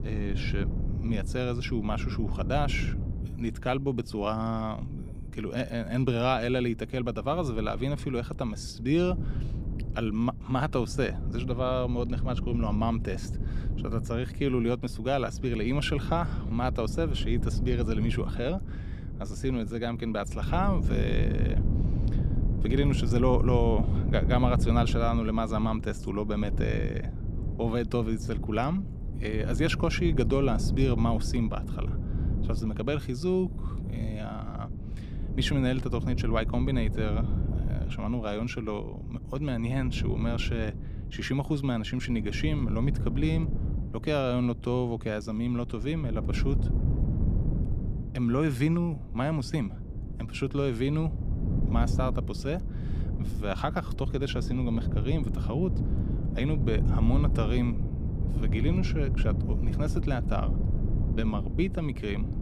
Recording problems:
wind noise on the microphone; occasional gusts; 10 dB below the speech

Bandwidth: 15 kHz